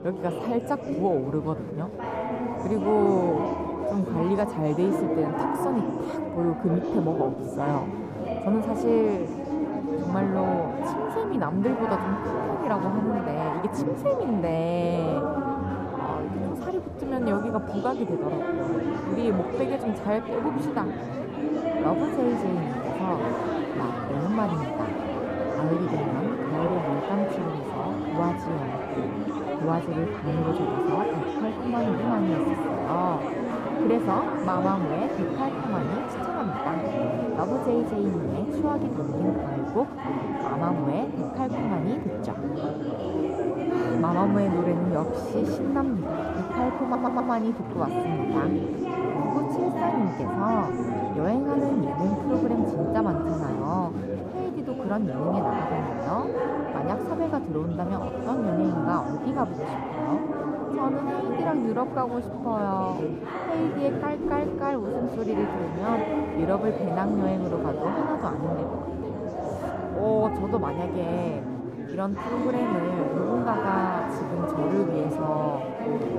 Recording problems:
muffled; slightly; fading above 1 kHz
chatter from many people; loud; throughout; as loud as the speech
audio stuttering; at 47 s

